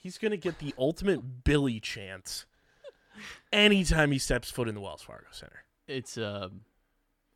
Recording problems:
none

